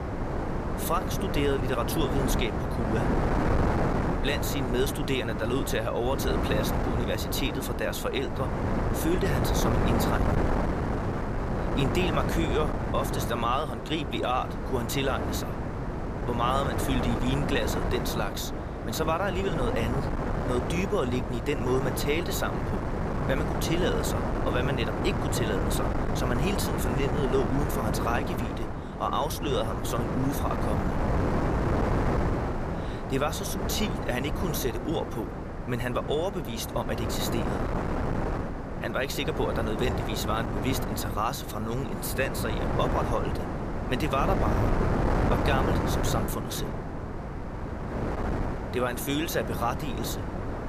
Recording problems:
wind noise on the microphone; heavy; 2 dB below the speech

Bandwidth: 14.5 kHz